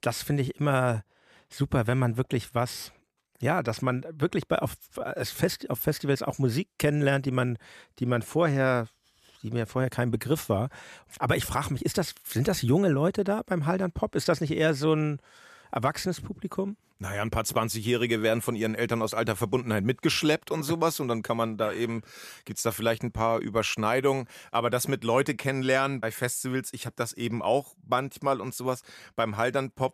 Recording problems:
none

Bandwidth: 14.5 kHz